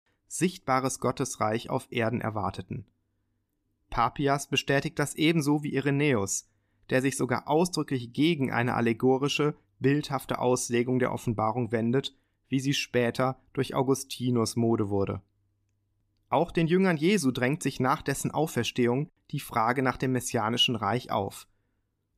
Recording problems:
none

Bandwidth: 14.5 kHz